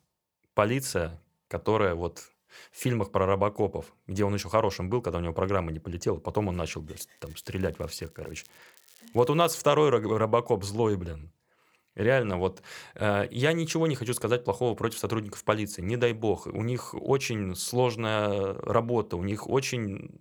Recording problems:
crackling; faint; from 7 to 9.5 s; 30 dB below the speech

